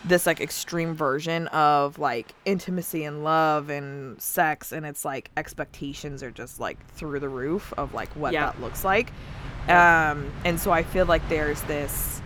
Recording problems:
train or aircraft noise; noticeable; throughout; 15 dB below the speech

